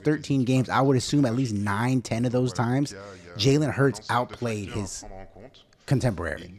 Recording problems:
voice in the background; faint; throughout; 20 dB below the speech

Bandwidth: 13.5 kHz